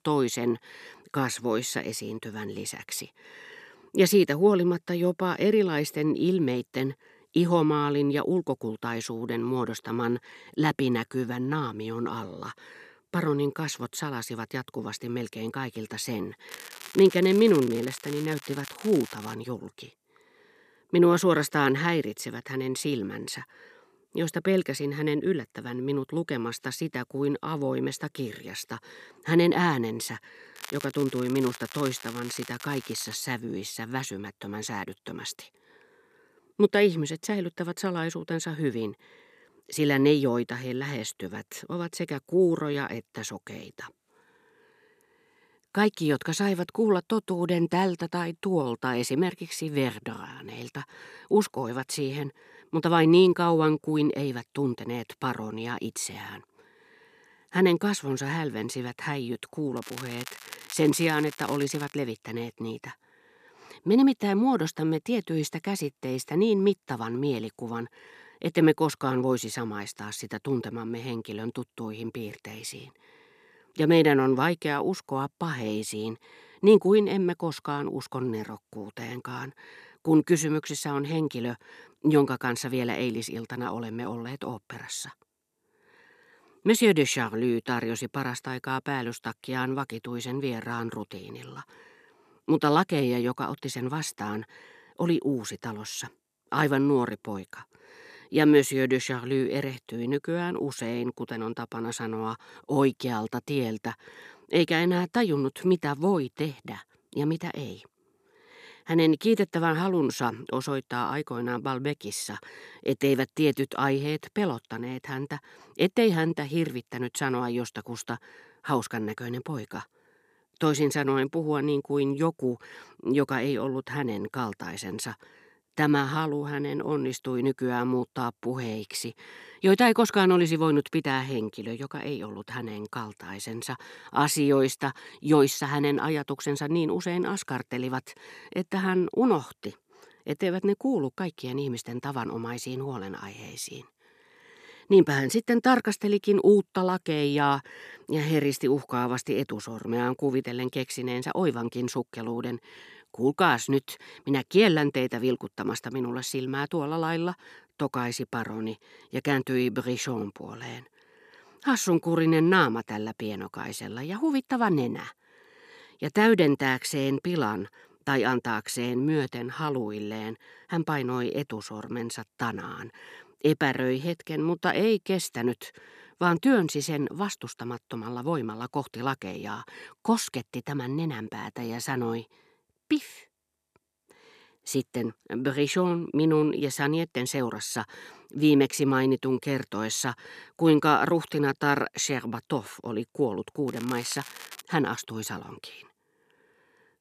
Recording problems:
crackling; noticeable; 4 times, first at 16 s; 15 dB below the speech

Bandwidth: 14.5 kHz